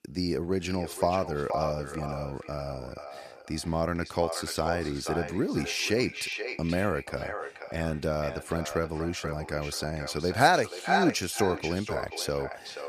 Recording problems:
echo of what is said; strong; throughout; 480 ms later, 7 dB below the speech

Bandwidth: 14.5 kHz